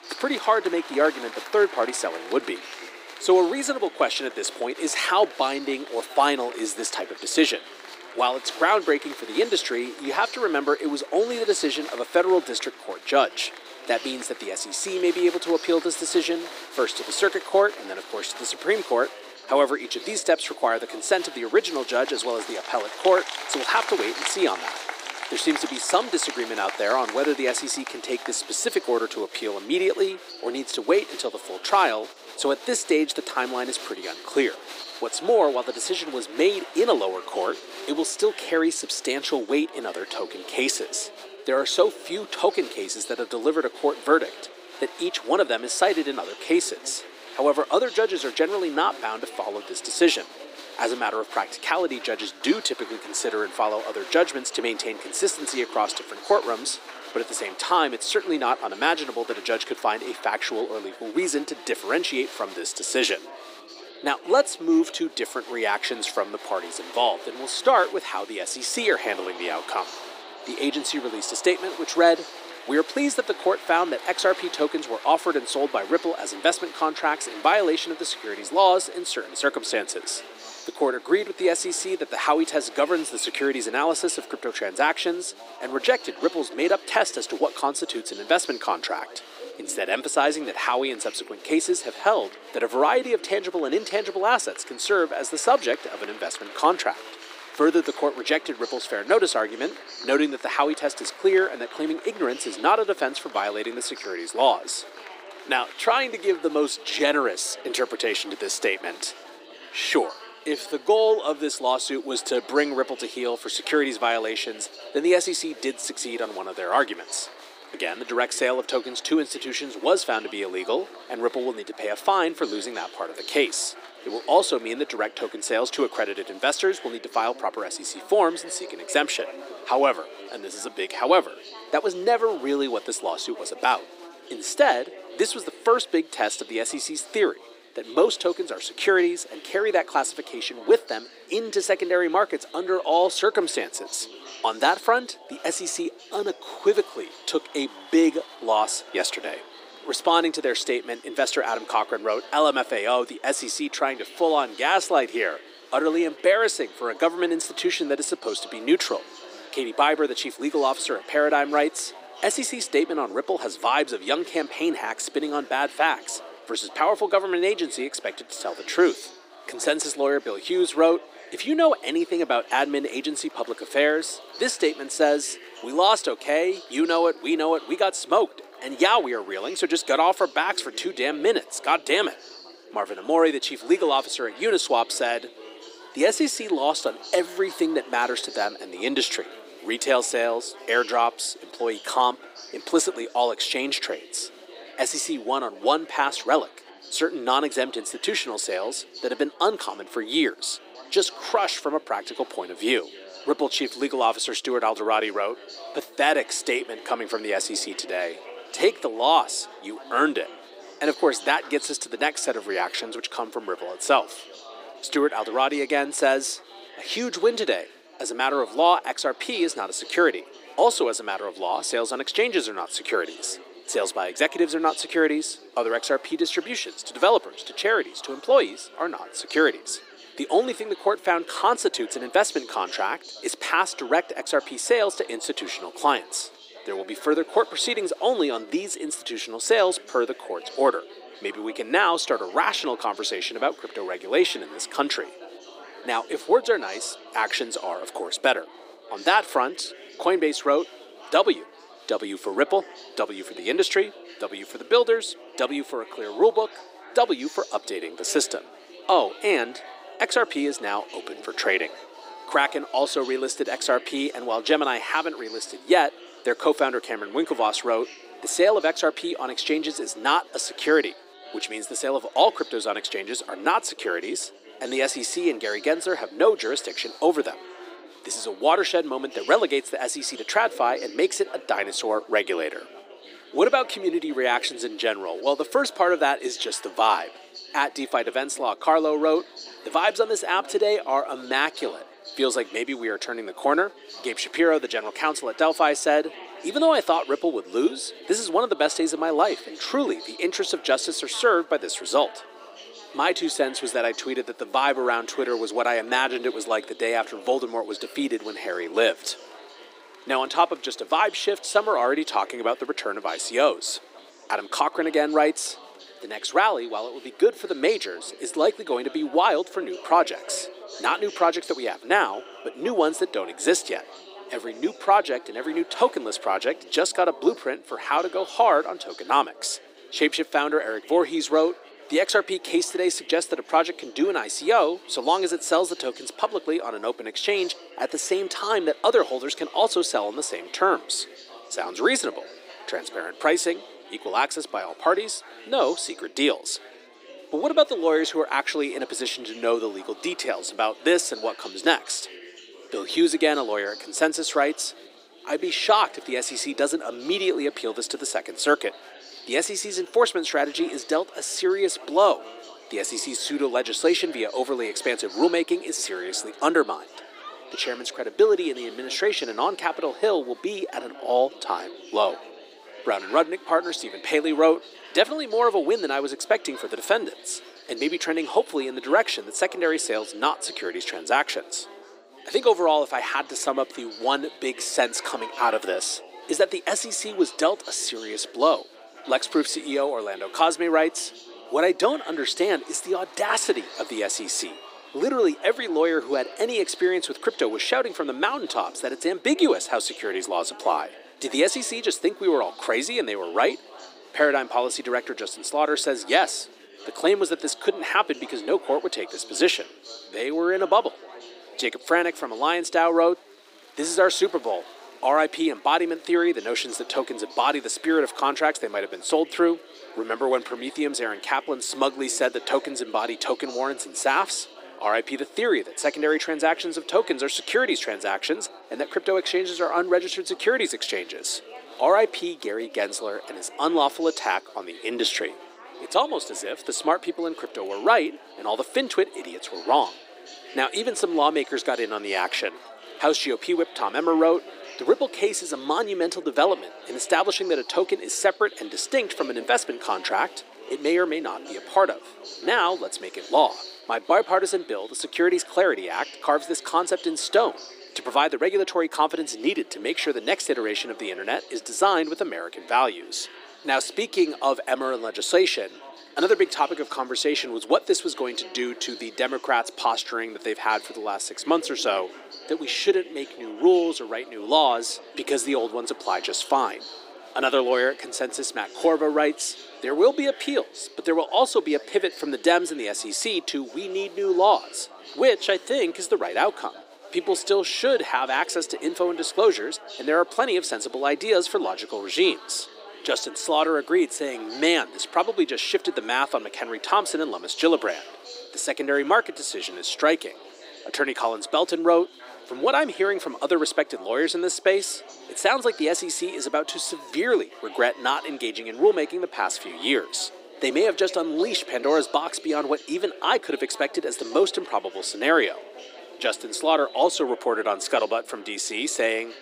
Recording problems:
thin; somewhat; fading below 300 Hz
chatter from many people; noticeable; throughout; 15 dB below the speech

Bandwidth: 15.5 kHz